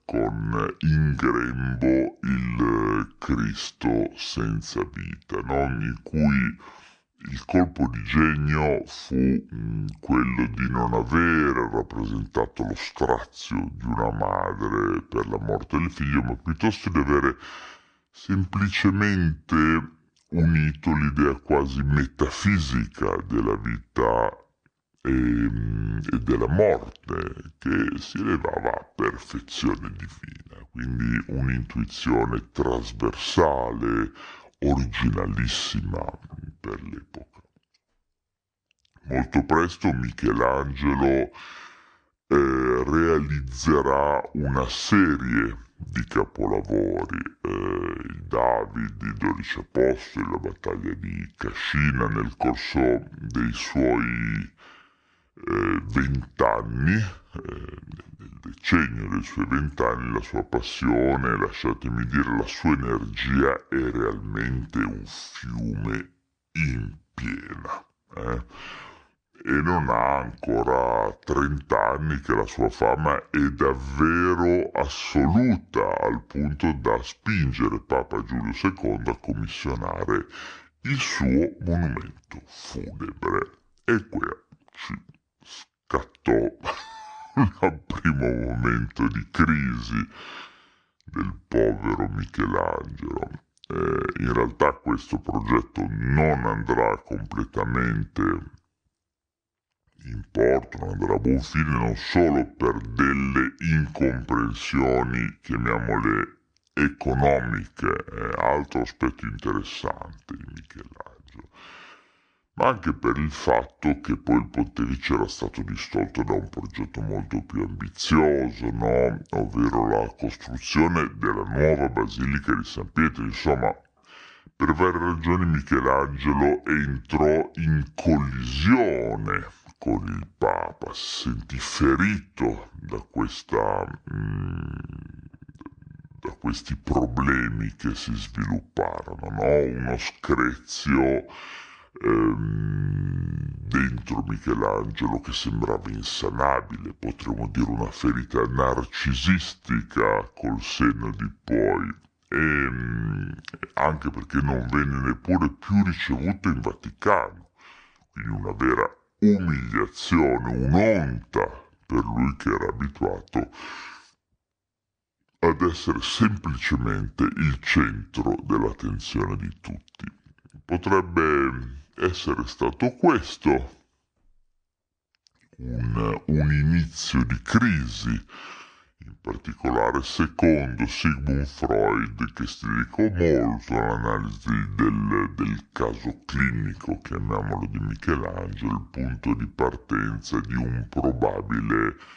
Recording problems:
wrong speed and pitch; too slow and too low; 0.7 times normal speed

